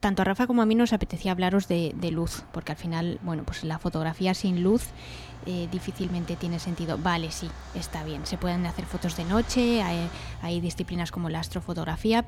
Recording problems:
traffic noise; noticeable; throughout; 15 dB below the speech

